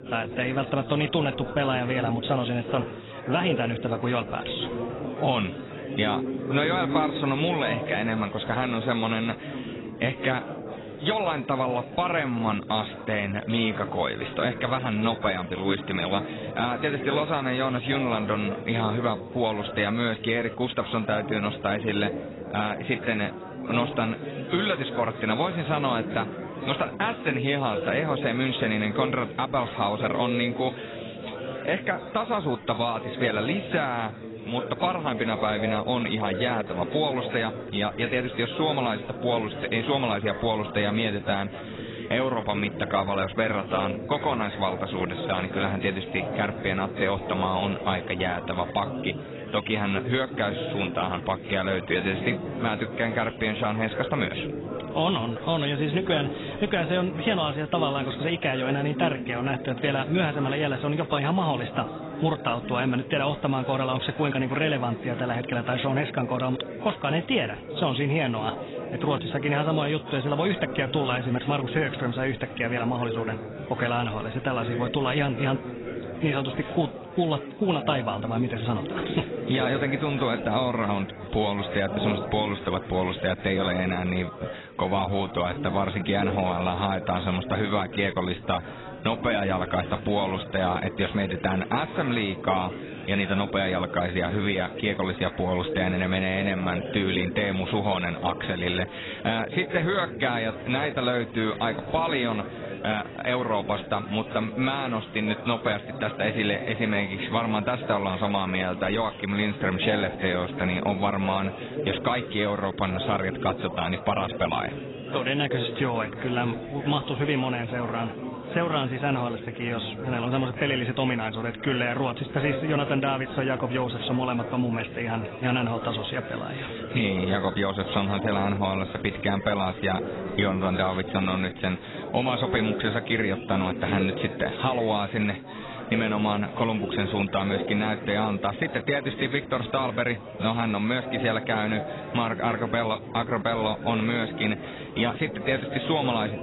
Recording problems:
garbled, watery; badly; nothing above 4 kHz
chatter from many people; loud; throughout; 9 dB below the speech

